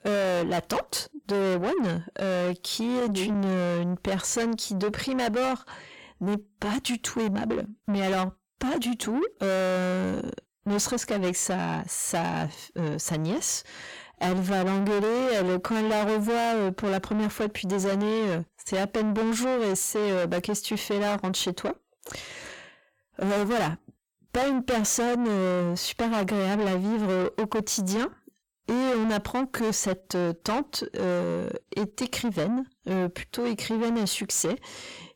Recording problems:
distortion; heavy; 6 dB below the speech

